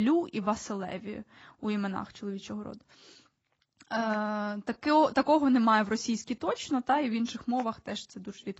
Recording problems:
garbled, watery; badly; nothing above 7.5 kHz
abrupt cut into speech; at the start

